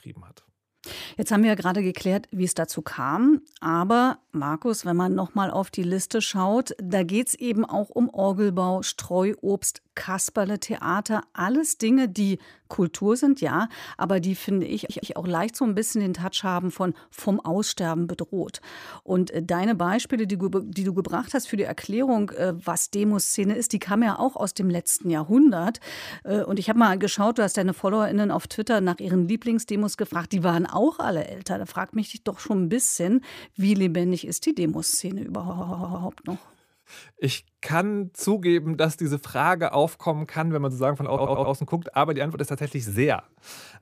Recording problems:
audio stuttering; at 15 s, at 35 s and at 41 s

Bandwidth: 15 kHz